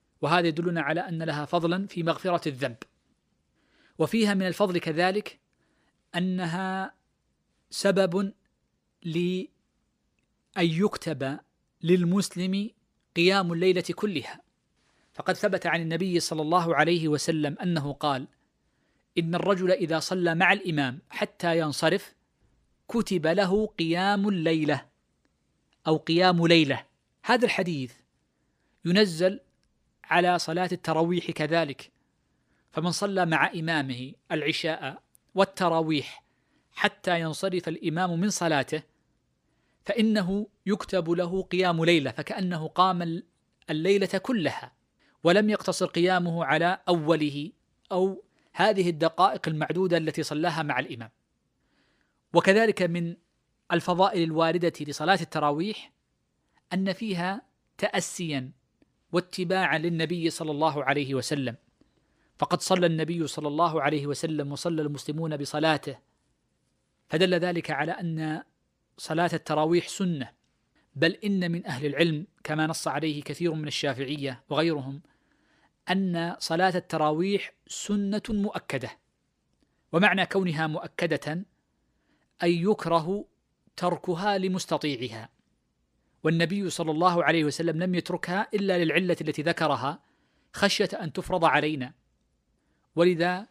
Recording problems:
none

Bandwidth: 15 kHz